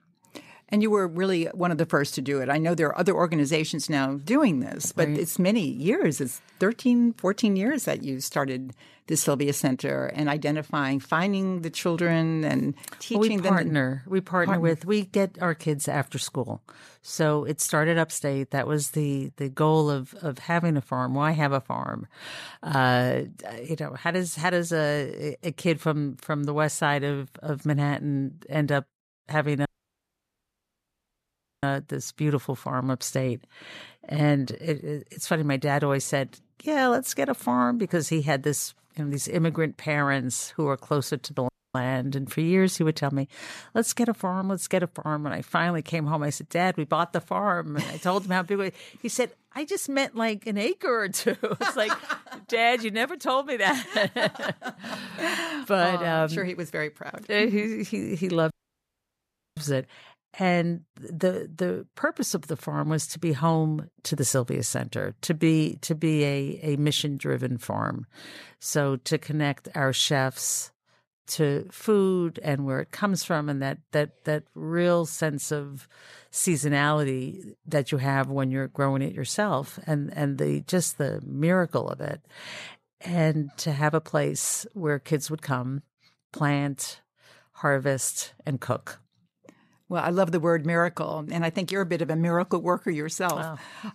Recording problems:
audio cutting out; at 30 s for 2 s, at 41 s and at 59 s for 1 s

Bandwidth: 14 kHz